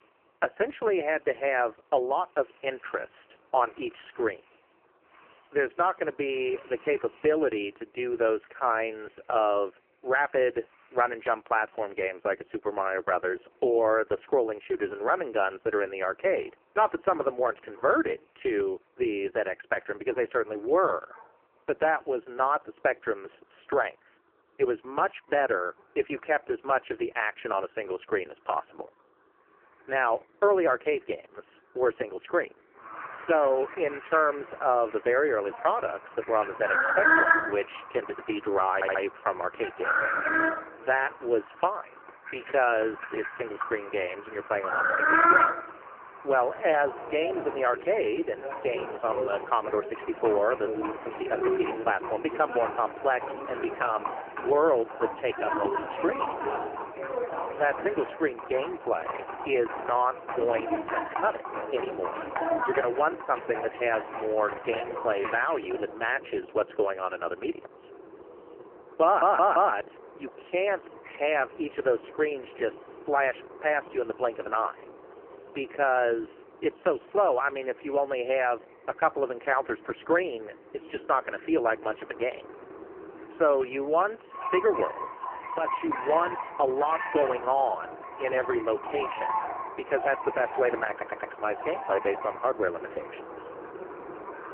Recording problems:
phone-call audio; poor line
muffled; very; fading above 1.5 kHz
animal sounds; loud; throughout; 3 dB below the speech
audio stuttering; at 39 s, at 1:09 and at 1:31

